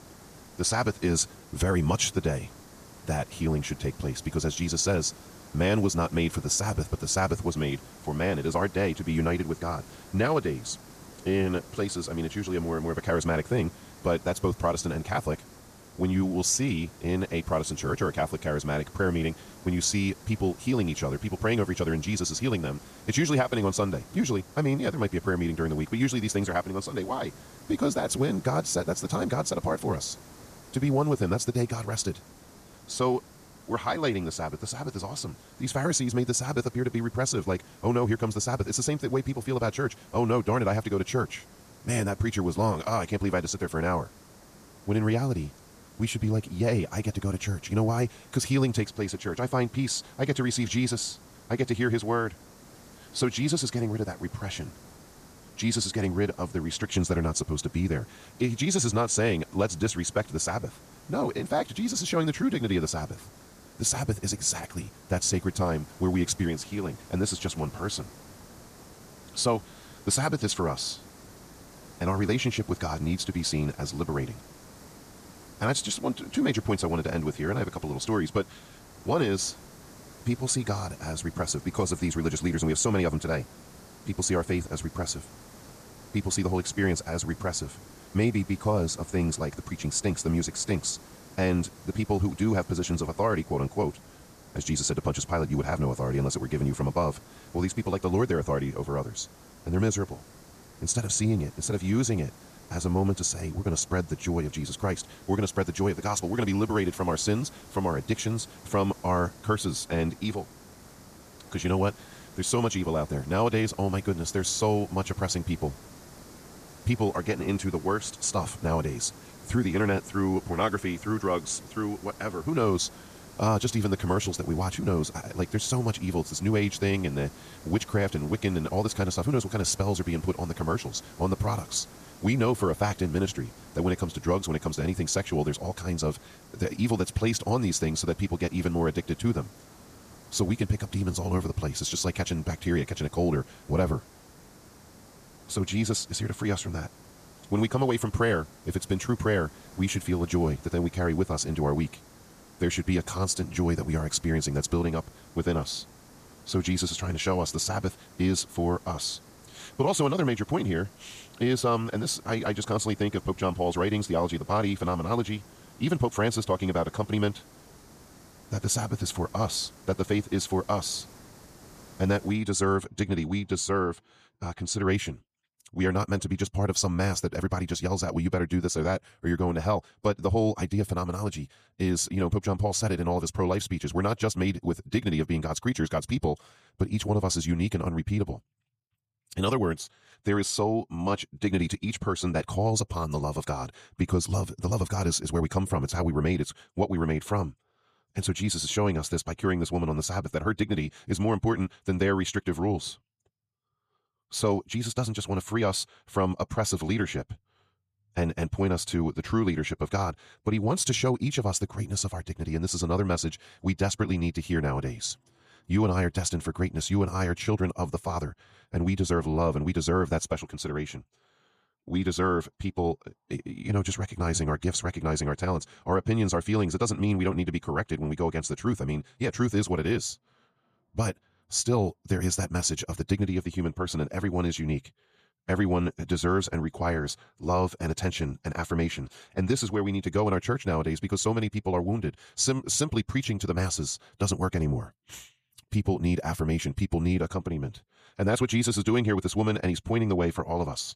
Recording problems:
wrong speed, natural pitch; too fast; 1.5 times normal speed
hiss; faint; until 2:52; 20 dB below the speech

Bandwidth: 14.5 kHz